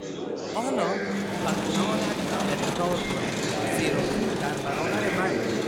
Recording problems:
murmuring crowd; very loud; throughout; 5 dB above the speech

